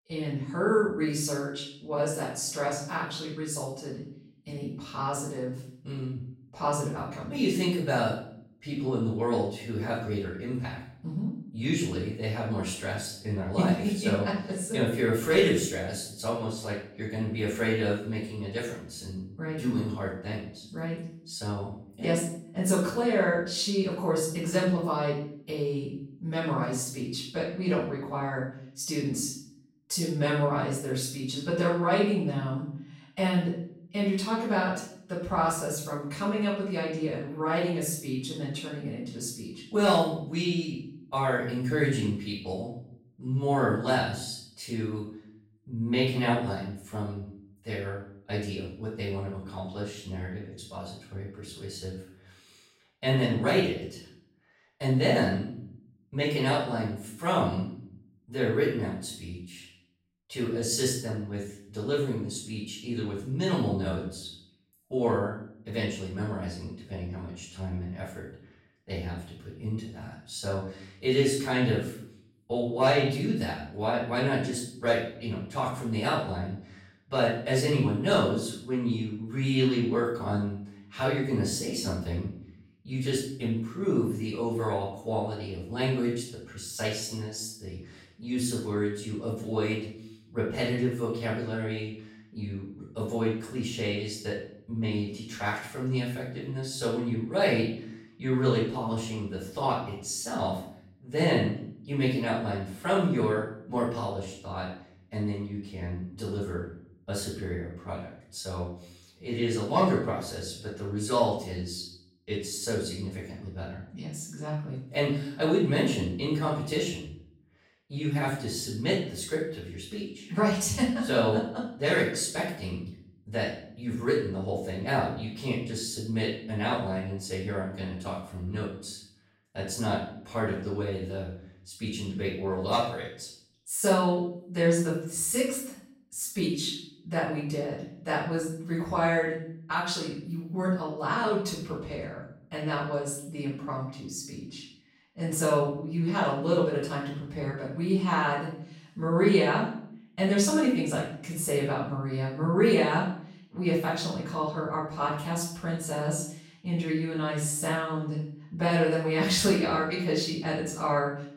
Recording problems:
off-mic speech; far
room echo; noticeable; dies away in 0.5 s

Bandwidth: 16 kHz